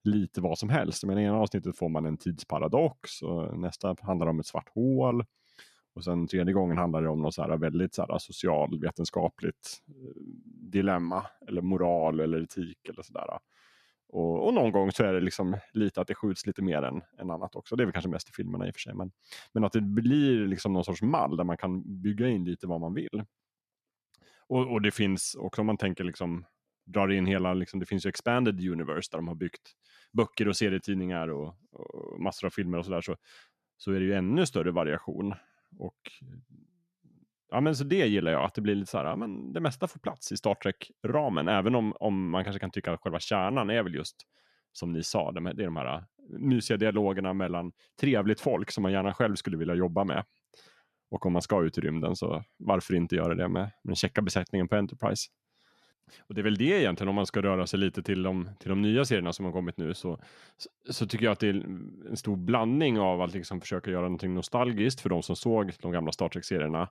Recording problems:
none

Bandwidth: 14 kHz